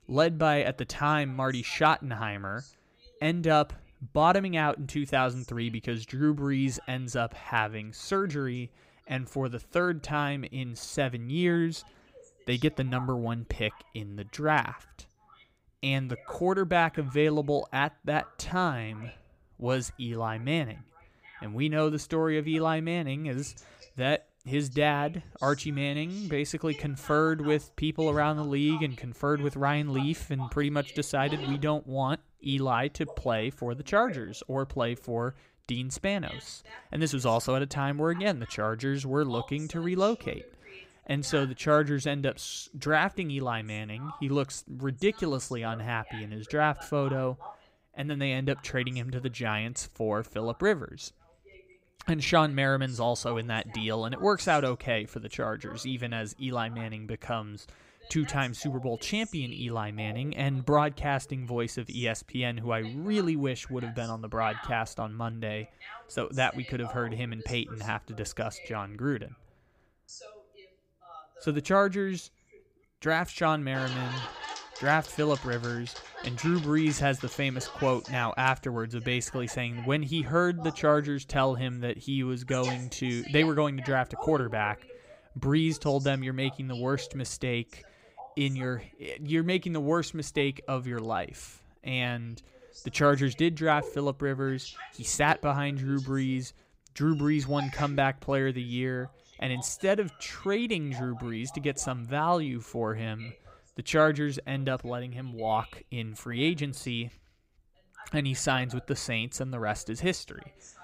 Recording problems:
voice in the background; noticeable; throughout; 20 dB below the speech

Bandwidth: 15.5 kHz